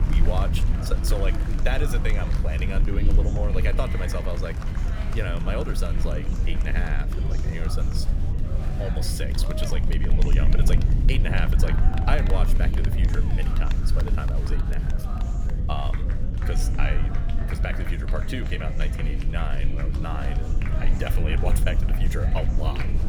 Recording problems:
chatter from many people; loud; throughout; 7 dB below the speech
low rumble; loud; throughout; 7 dB below the speech

